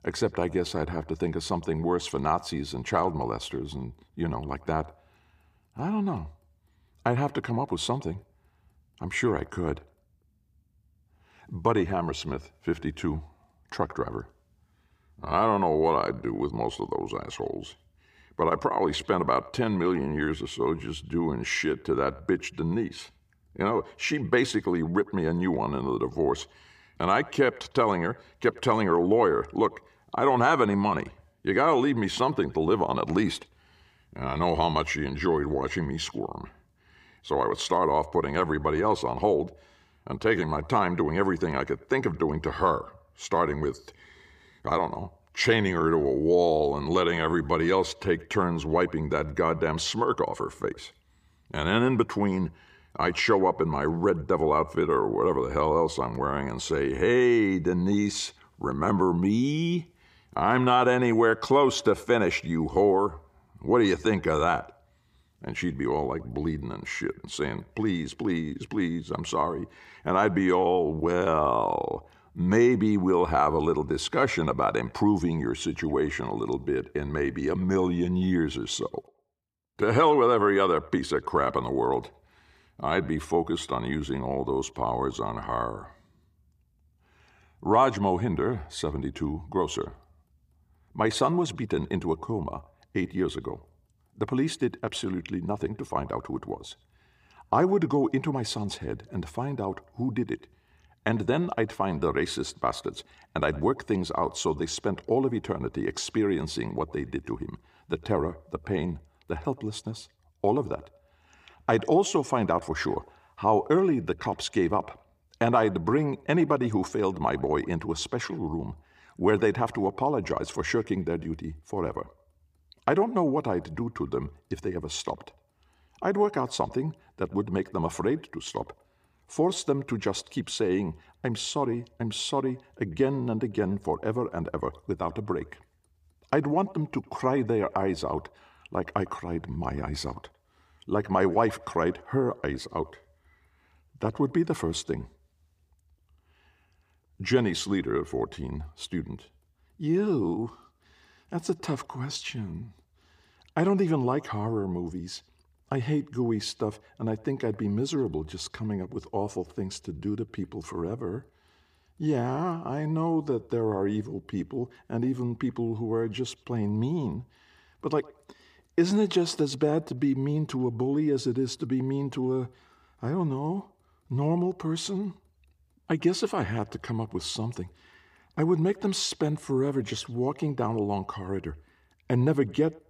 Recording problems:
echo of what is said; faint; throughout; 100 ms later, 25 dB below the speech

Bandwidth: 15 kHz